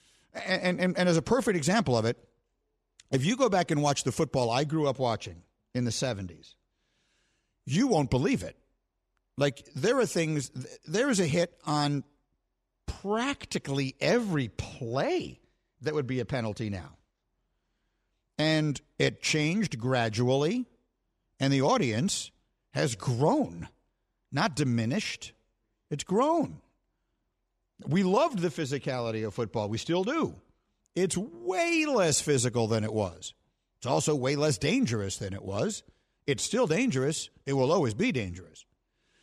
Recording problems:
none

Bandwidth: 14.5 kHz